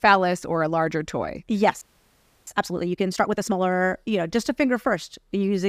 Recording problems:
audio freezing; at 2 s for 0.5 s
abrupt cut into speech; at the end

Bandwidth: 15 kHz